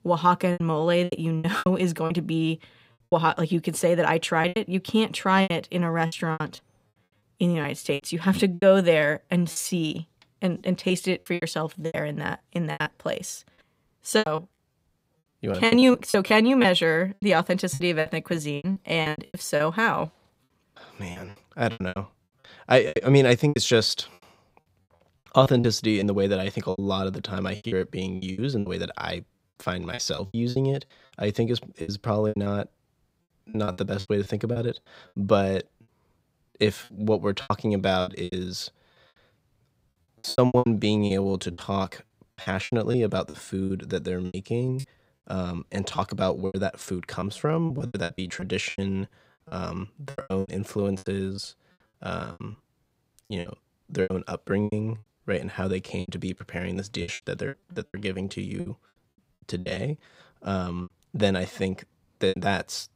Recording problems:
choppy; very; 15% of the speech affected

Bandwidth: 15.5 kHz